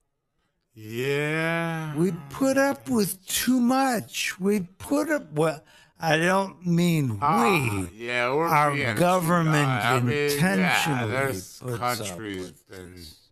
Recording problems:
wrong speed, natural pitch; too slow; 0.5 times normal speed

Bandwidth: 13.5 kHz